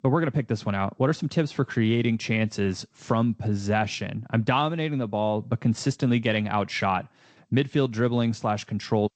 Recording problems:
garbled, watery; slightly; nothing above 8 kHz

